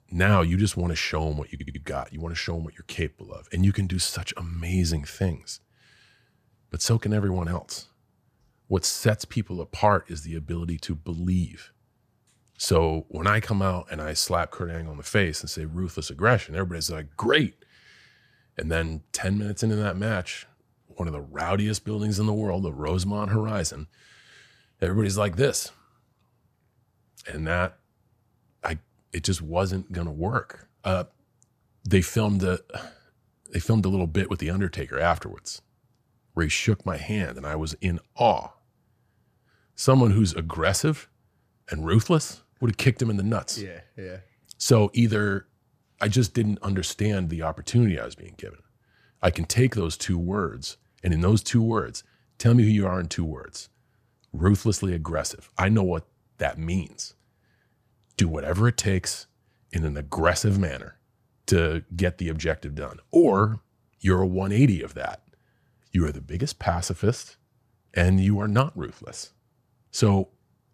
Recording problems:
audio stuttering; at 1.5 s

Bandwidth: 15 kHz